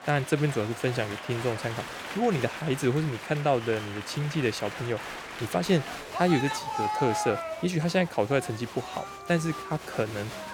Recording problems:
crowd noise; loud; throughout; 7 dB below the speech

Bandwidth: 19 kHz